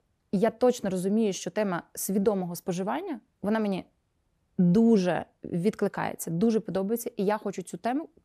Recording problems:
none

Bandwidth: 14.5 kHz